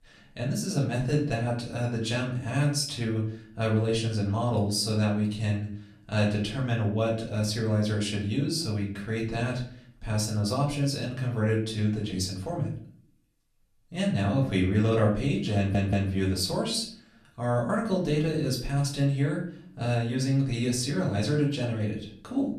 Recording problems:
off-mic speech; far
room echo; slight; dies away in 0.5 s
audio stuttering; at 16 s

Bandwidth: 13.5 kHz